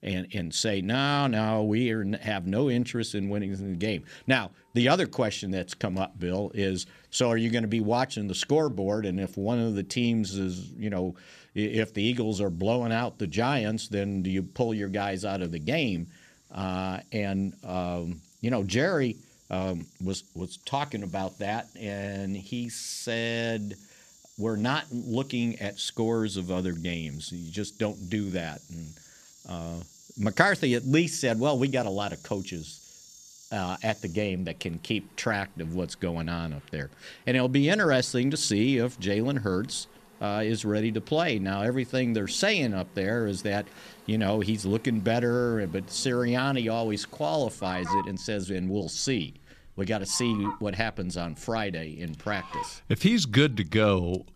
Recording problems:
animal sounds; noticeable; throughout; 20 dB below the speech

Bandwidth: 14.5 kHz